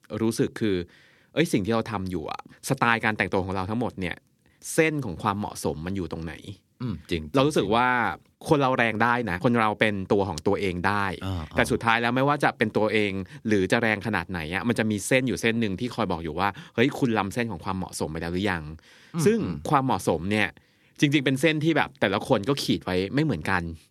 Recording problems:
none

